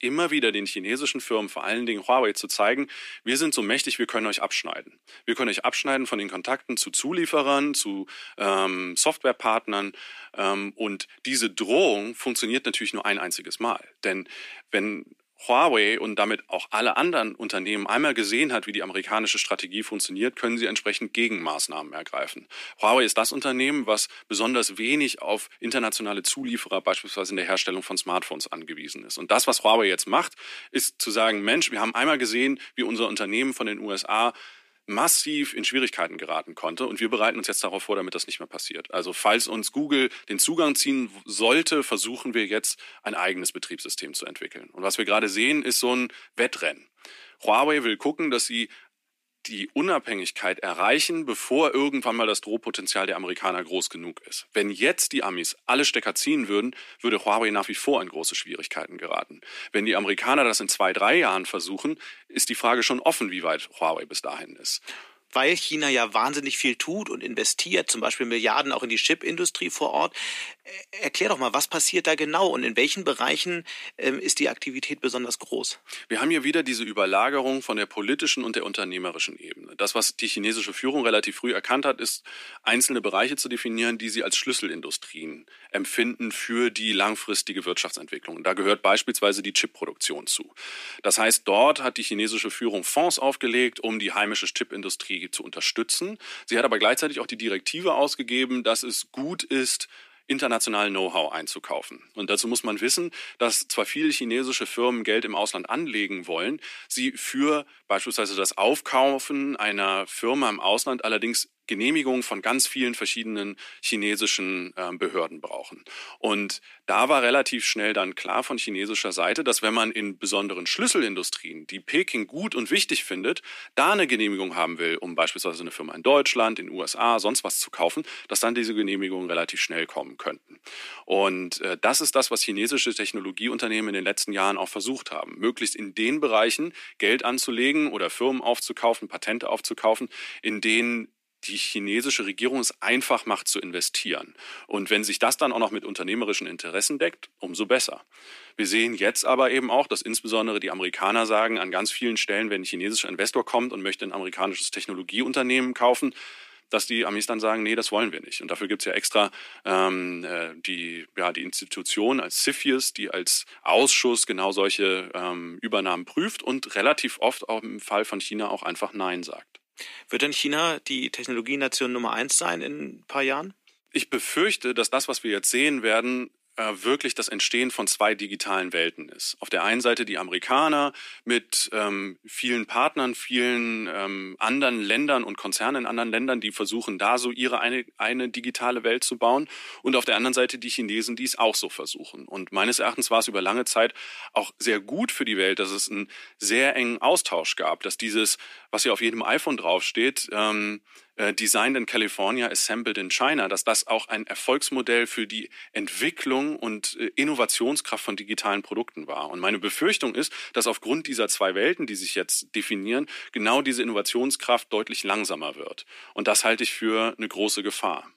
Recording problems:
thin; somewhat; fading below 300 Hz

